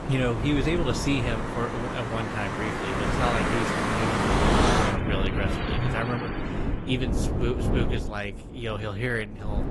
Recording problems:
garbled, watery; slightly; nothing above 11.5 kHz
traffic noise; very loud; until 6.5 s; 2 dB above the speech
wind noise on the microphone; heavy; 7 dB below the speech

